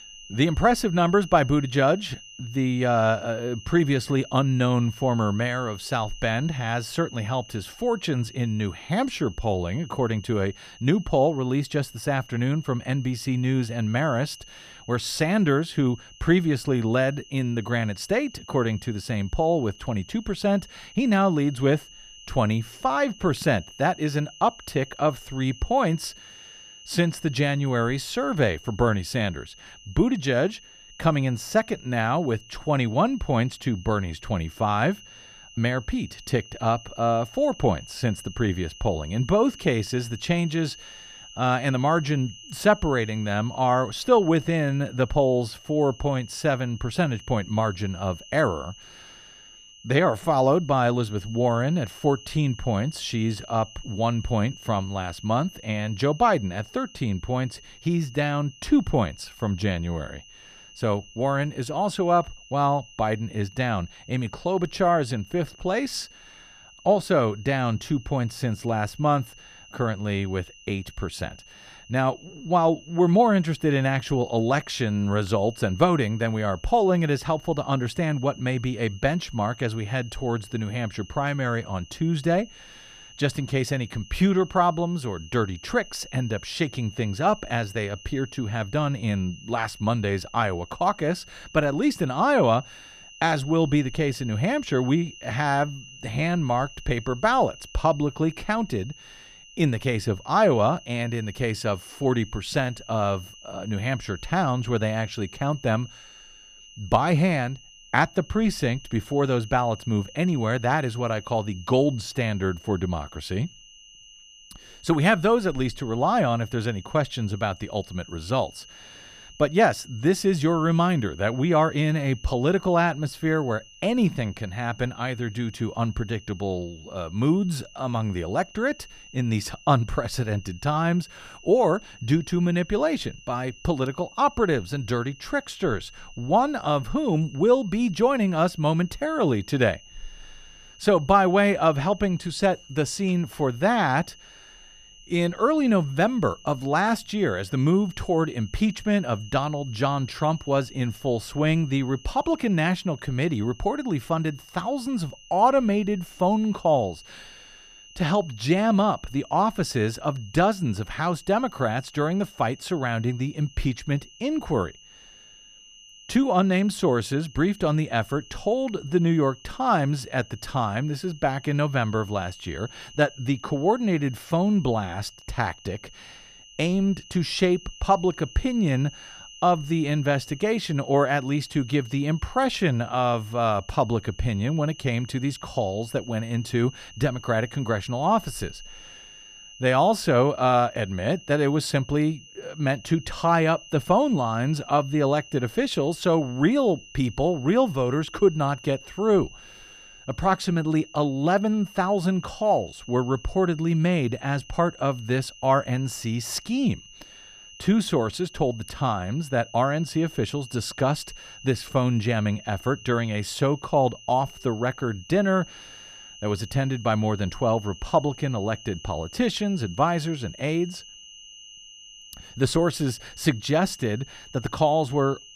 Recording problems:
high-pitched whine; faint; throughout; 3 kHz, 20 dB below the speech

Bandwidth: 14.5 kHz